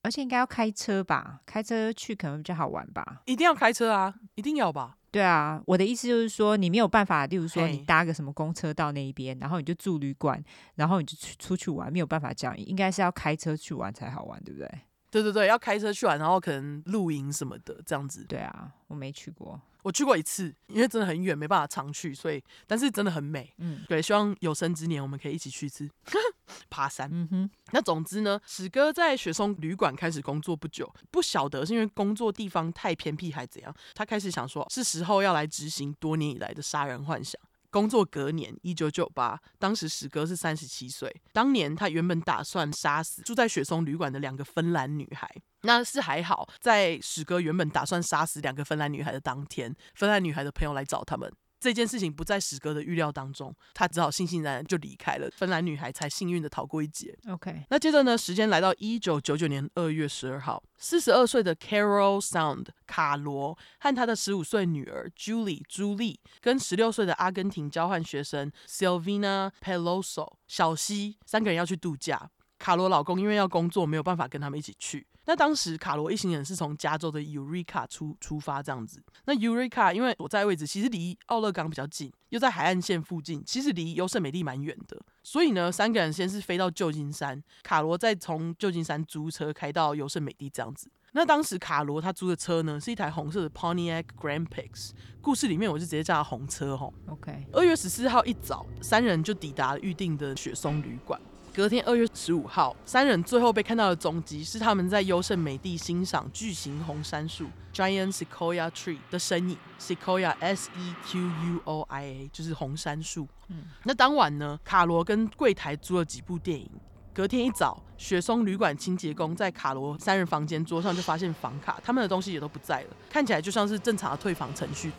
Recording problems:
traffic noise; noticeable; from 1:33 on; 20 dB below the speech

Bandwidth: 18.5 kHz